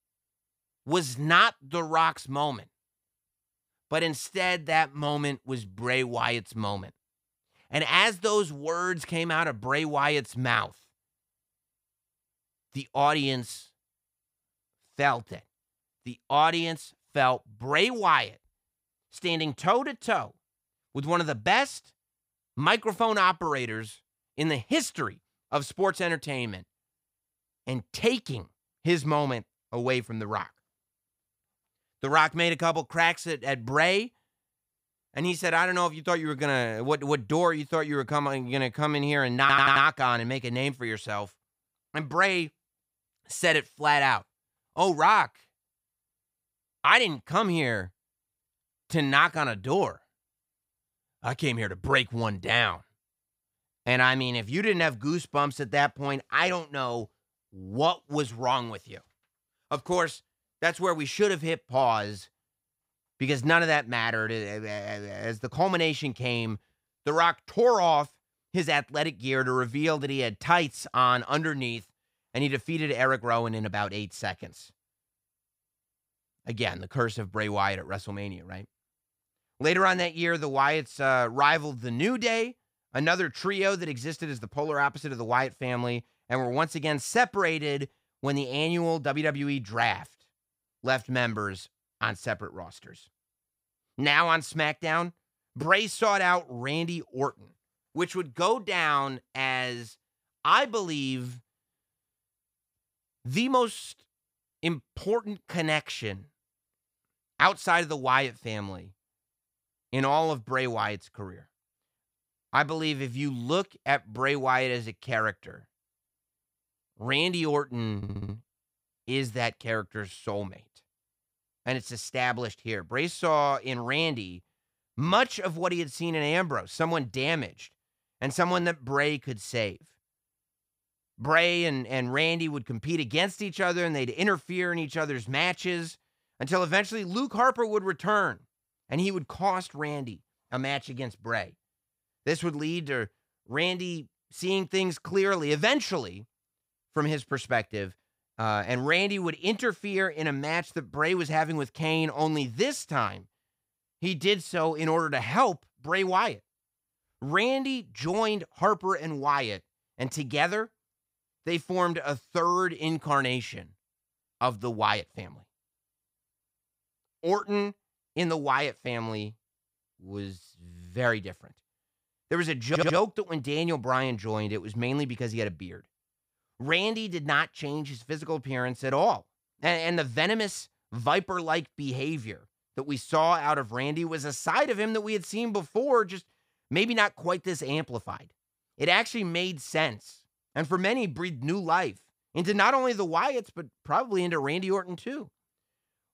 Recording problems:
audio stuttering; at 39 s, at 1:58 and at 2:53

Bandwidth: 15.5 kHz